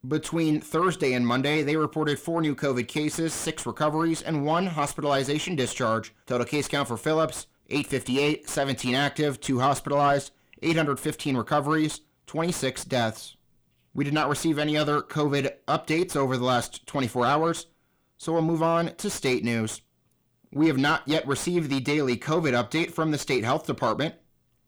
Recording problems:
distortion; slight; 10 dB below the speech

